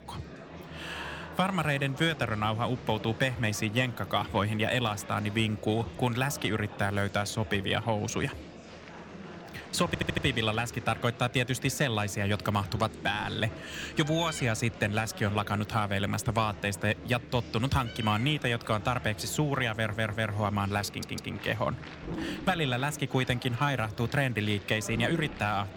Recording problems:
animal sounds; noticeable; throughout; 15 dB below the speech
murmuring crowd; noticeable; throughout; 15 dB below the speech
audio stuttering; at 10 s, at 20 s and at 21 s

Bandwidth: 17 kHz